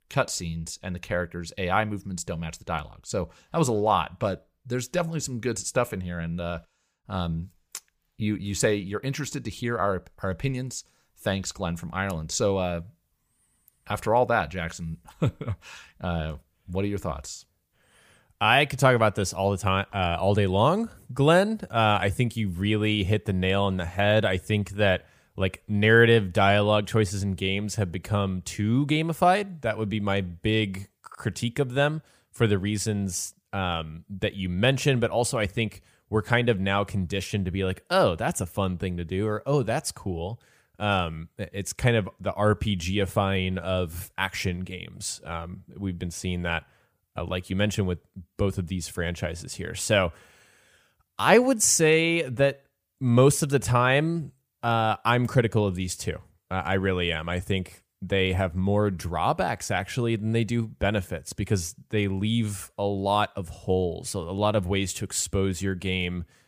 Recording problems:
none

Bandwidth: 15 kHz